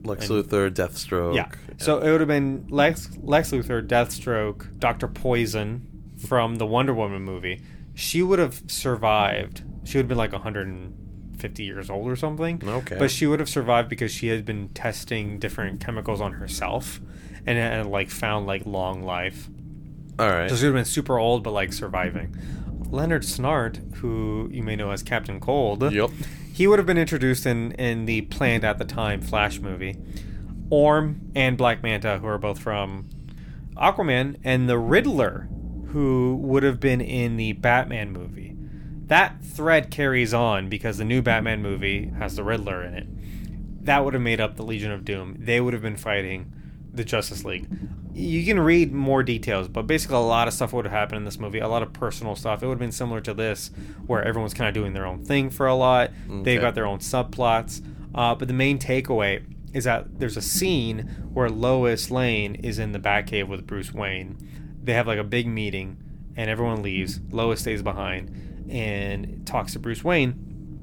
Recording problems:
low rumble; faint; throughout; 25 dB below the speech

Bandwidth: 18.5 kHz